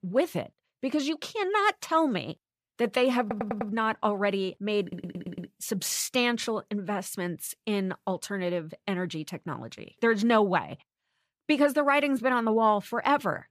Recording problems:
audio stuttering; at 3 s and at 5 s

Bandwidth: 14.5 kHz